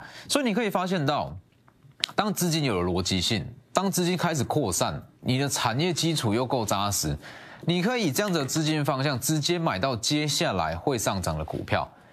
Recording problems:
squashed, flat; somewhat

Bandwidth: 14.5 kHz